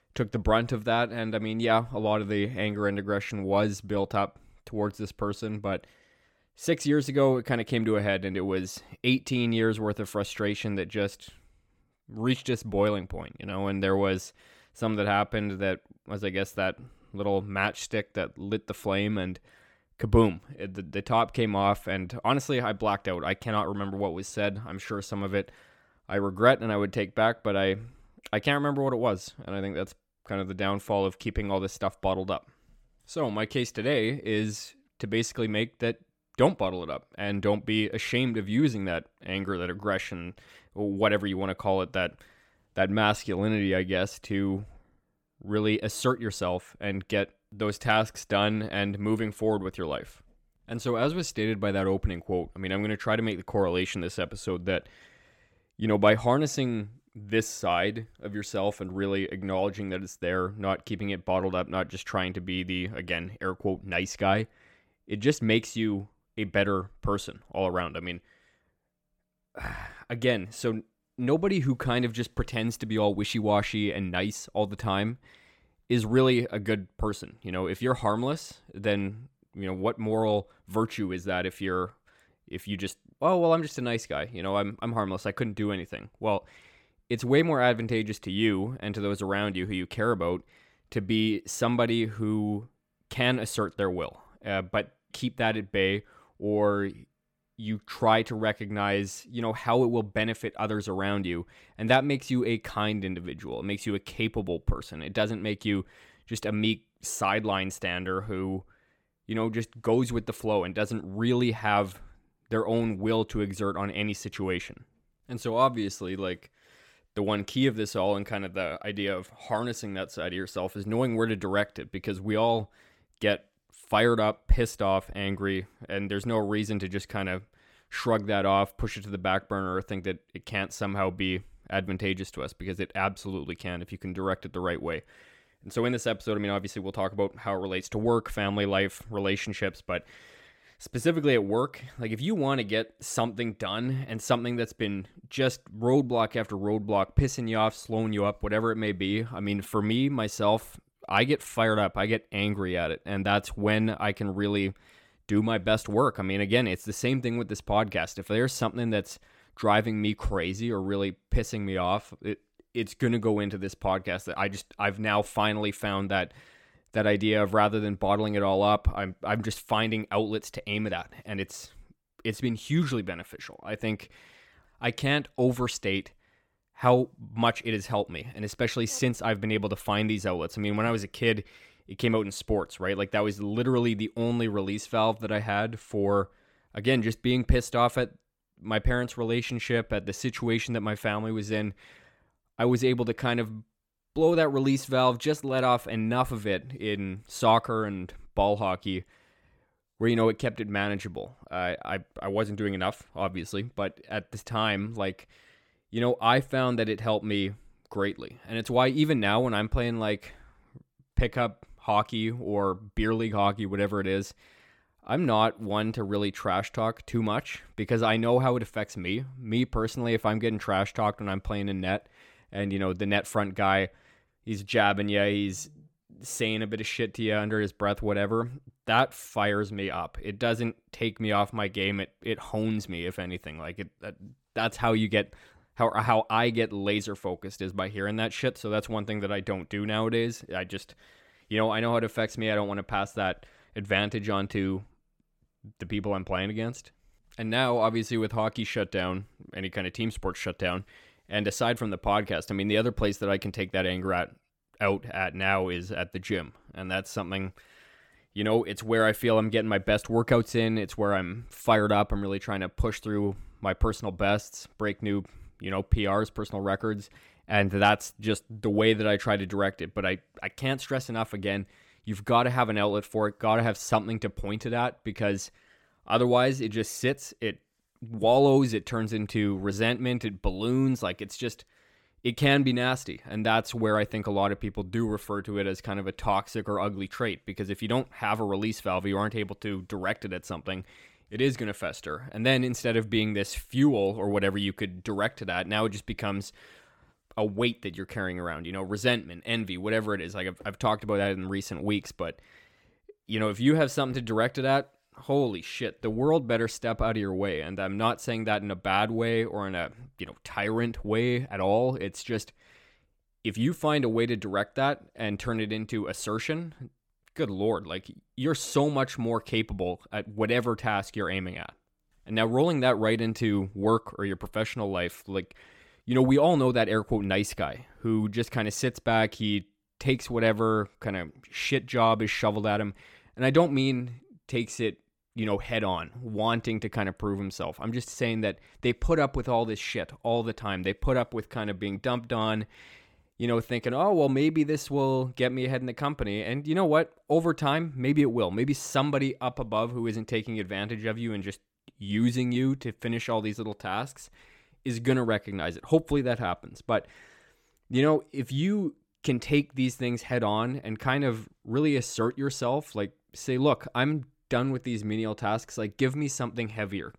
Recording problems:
none

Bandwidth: 17 kHz